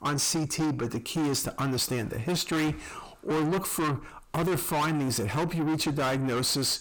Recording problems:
distortion; heavy; 6 dB below the speech

